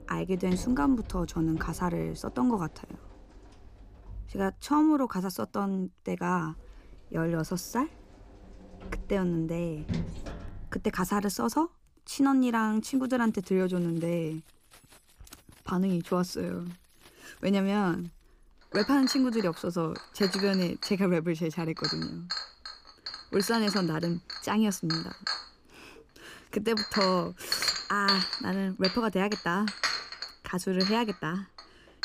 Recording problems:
household noises; loud; throughout; 5 dB below the speech

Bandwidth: 15 kHz